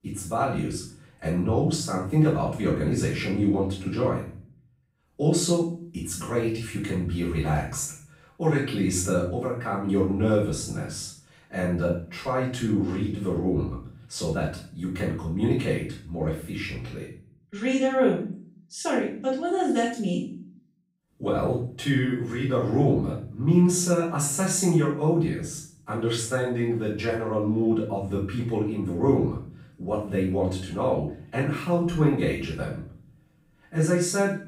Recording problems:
off-mic speech; far
room echo; noticeable; dies away in 0.5 s

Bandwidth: 15.5 kHz